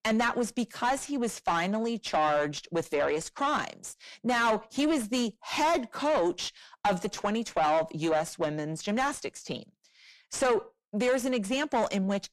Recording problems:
distortion; heavy; 7 dB below the speech

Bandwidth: 13.5 kHz